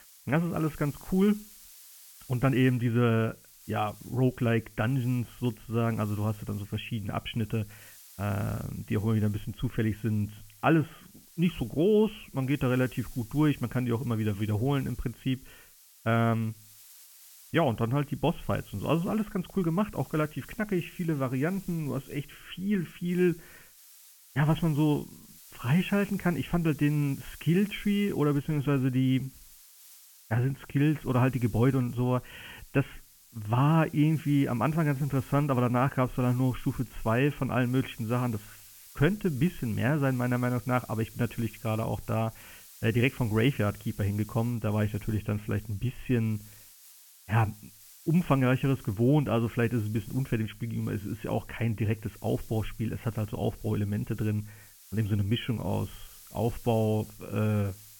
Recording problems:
high frequencies cut off; severe; nothing above 3.5 kHz
hiss; faint; throughout; 20 dB below the speech

